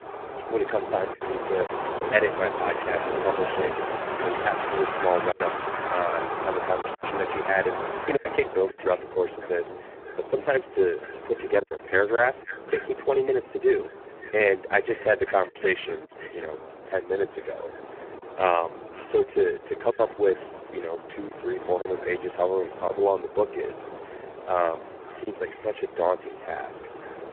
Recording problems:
phone-call audio; poor line
echo of what is said; faint; throughout; 540 ms later, 20 dB below the speech
wind in the background; loud; throughout; 7 dB below the speech
choppy; occasionally; 4% of the speech affected

